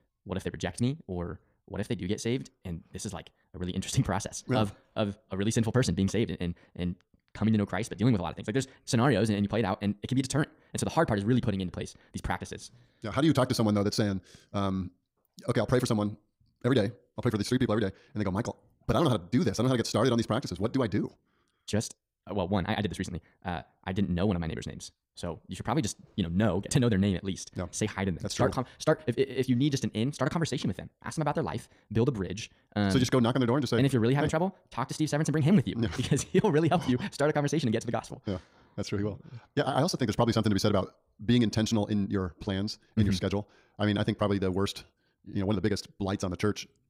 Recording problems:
wrong speed, natural pitch; too fast; 1.8 times normal speed

